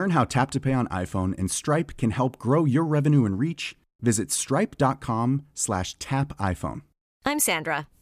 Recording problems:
abrupt cut into speech; at the start

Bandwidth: 14.5 kHz